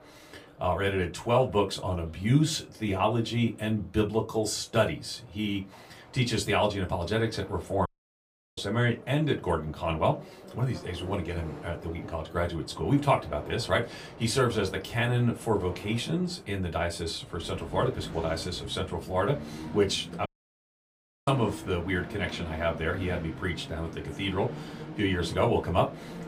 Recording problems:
off-mic speech; far
room echo; very slight; dies away in 0.2 s
train or aircraft noise; noticeable; throughout; 15 dB below the speech
audio cutting out; at 8 s for 0.5 s and at 20 s for 1 s

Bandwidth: 15 kHz